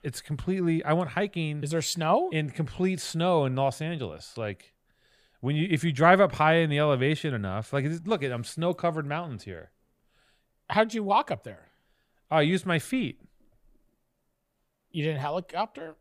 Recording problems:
none

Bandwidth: 15 kHz